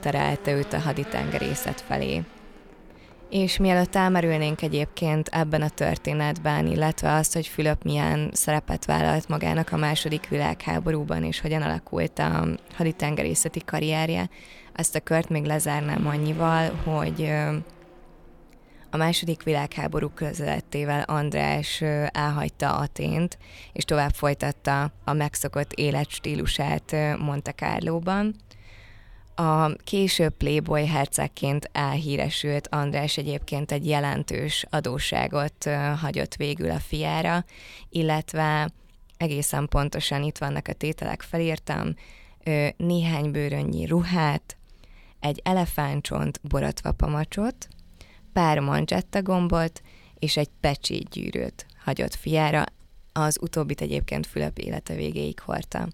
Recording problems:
traffic noise; faint; throughout; 20 dB below the speech

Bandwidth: 17.5 kHz